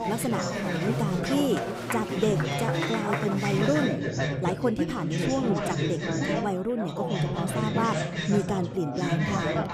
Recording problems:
chatter from many people; very loud; throughout; 1 dB above the speech

